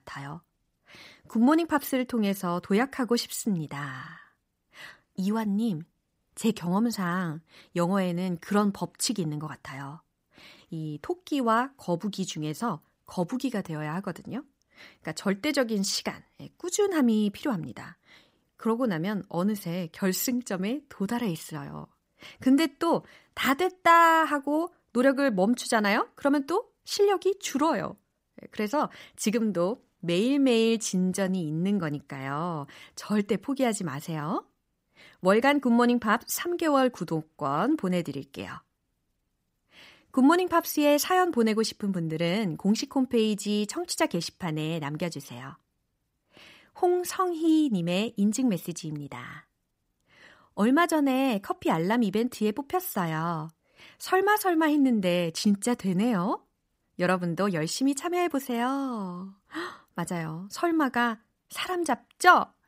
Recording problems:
none

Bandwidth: 15.5 kHz